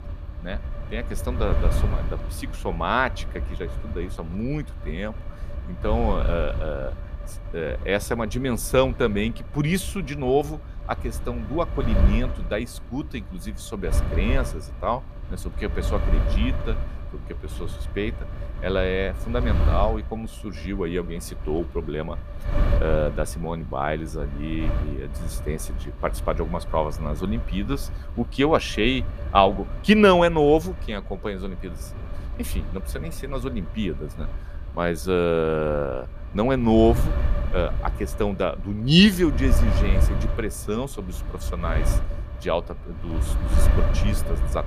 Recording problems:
wind noise on the microphone; occasional gusts; 15 dB below the speech

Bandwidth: 14.5 kHz